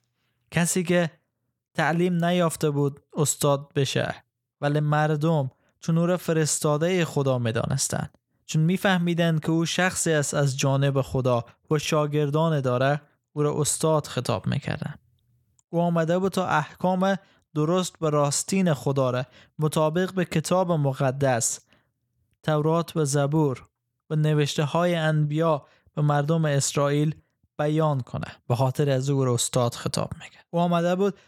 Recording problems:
none

